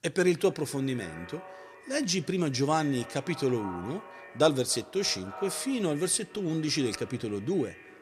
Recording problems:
echo of what is said; noticeable; throughout; 270 ms later, 15 dB below the speech

